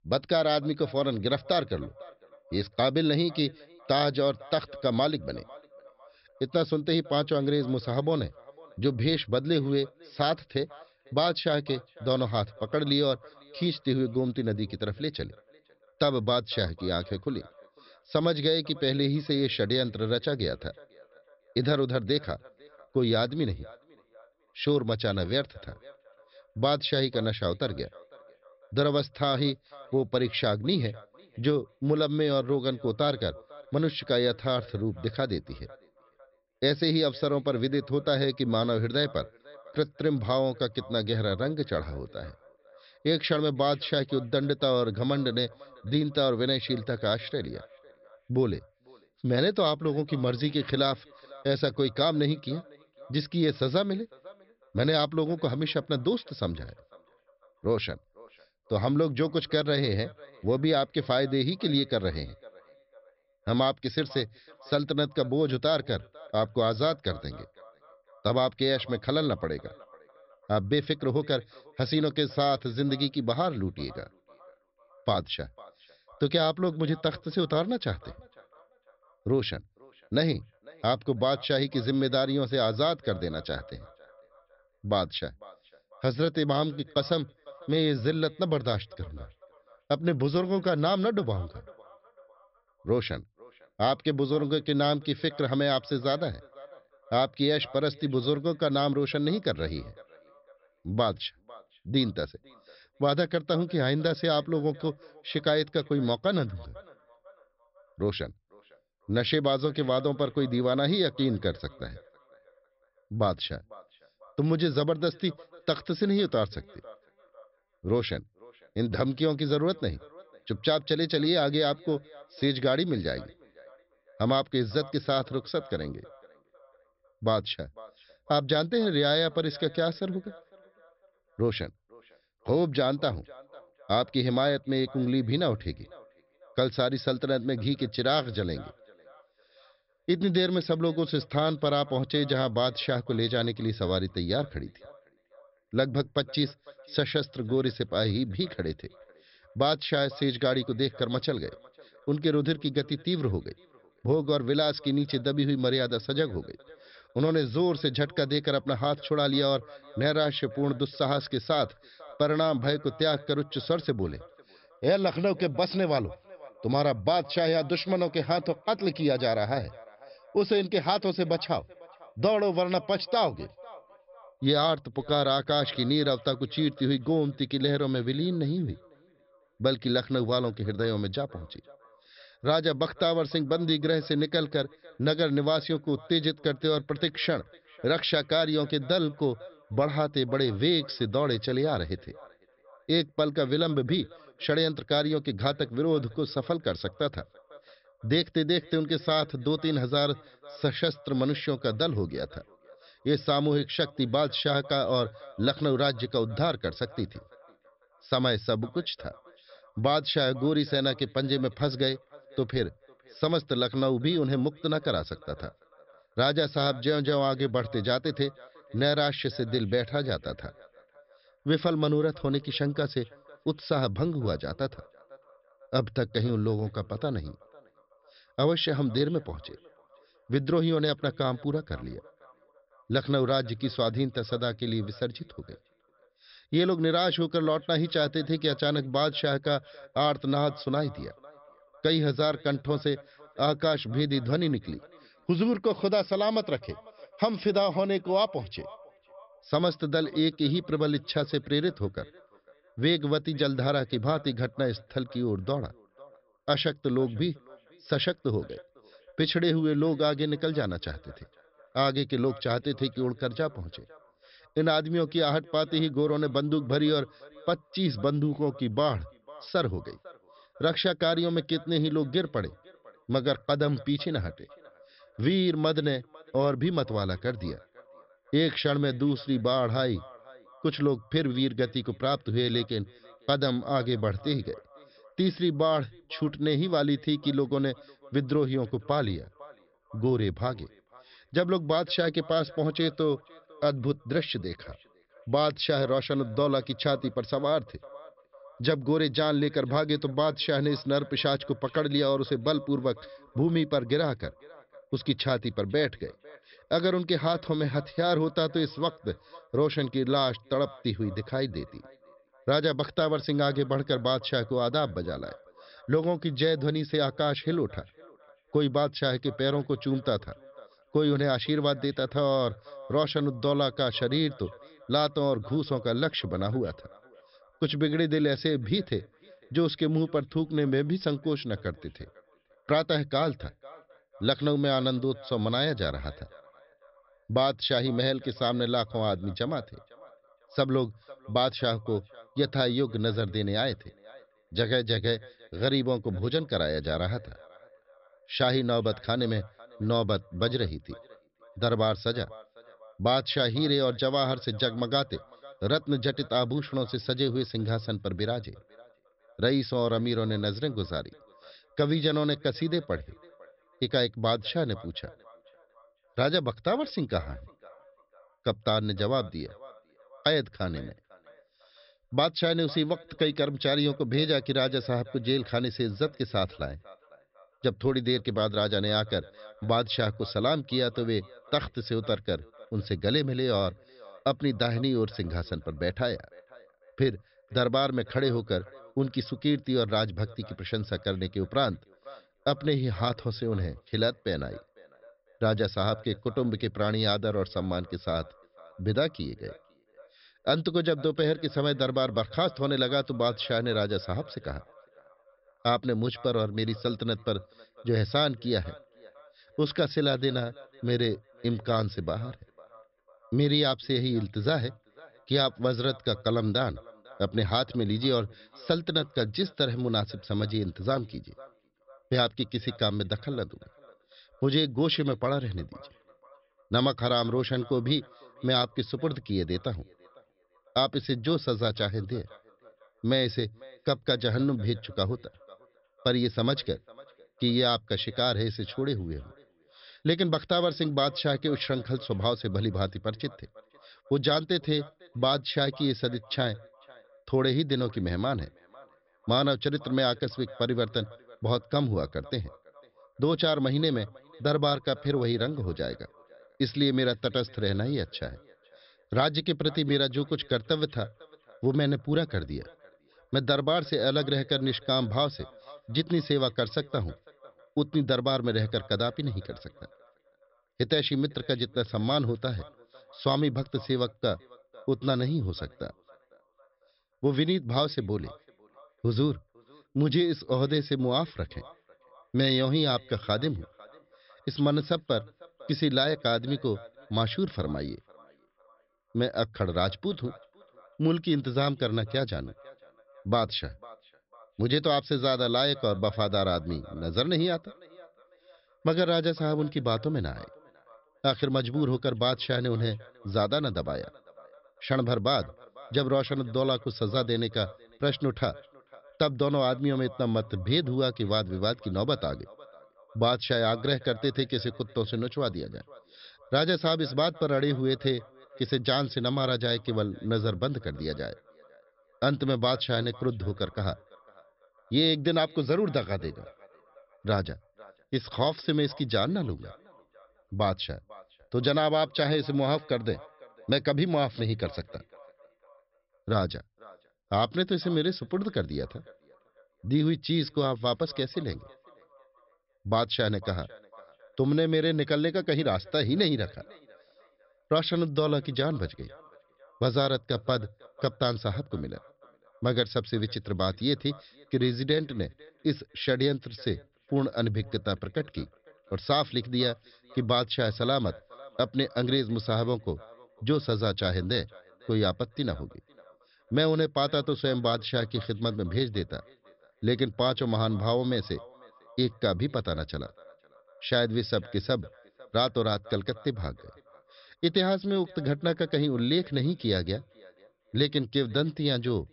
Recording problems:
high frequencies cut off; noticeable; nothing above 5.5 kHz
echo of what is said; faint; throughout; 500 ms later, 25 dB below the speech

